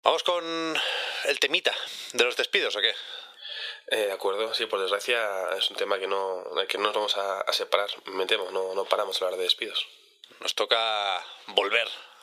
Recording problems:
thin; very; fading below 500 Hz
squashed, flat; heavily

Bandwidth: 15 kHz